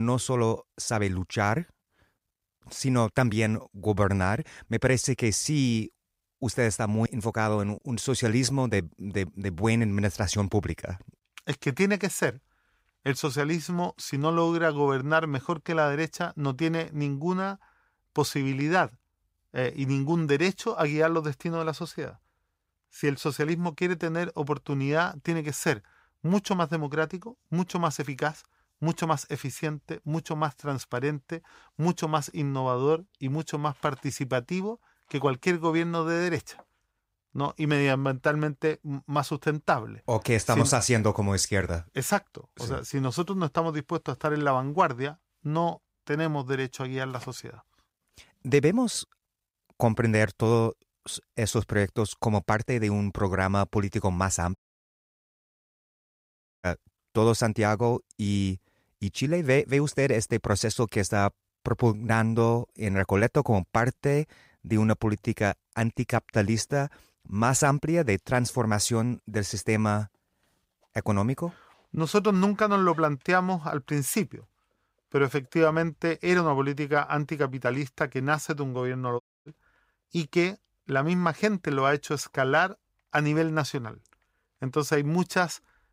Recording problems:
abrupt cut into speech; at the start
audio cutting out; at 55 s for 2 s and at 1:19

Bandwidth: 15.5 kHz